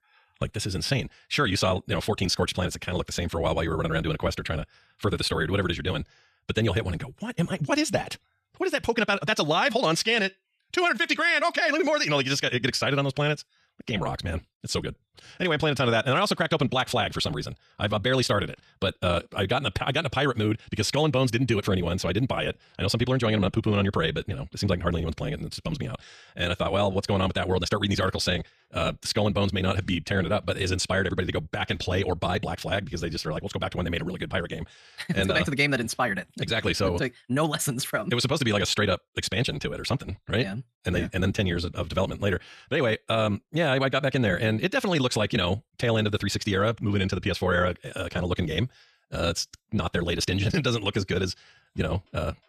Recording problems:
wrong speed, natural pitch; too fast; 1.7 times normal speed

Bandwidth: 13.5 kHz